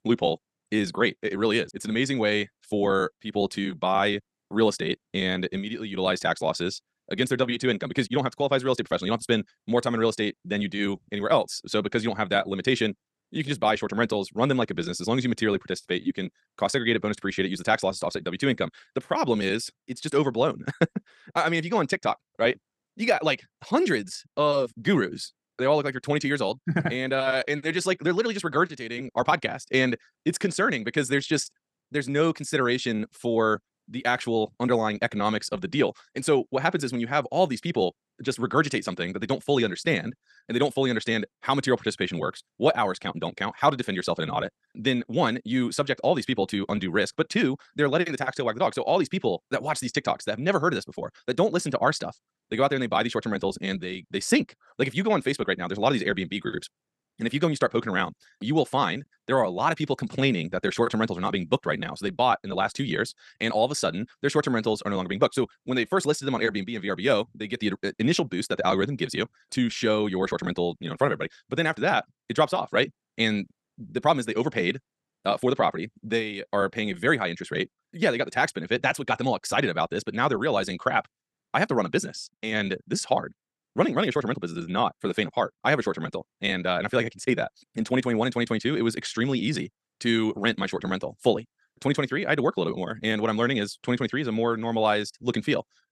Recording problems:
wrong speed, natural pitch; too fast; 1.6 times normal speed

